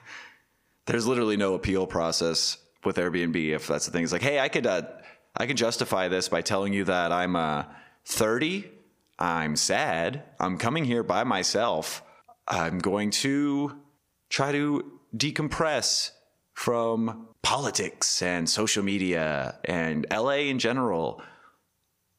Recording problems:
squashed, flat; heavily

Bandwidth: 15 kHz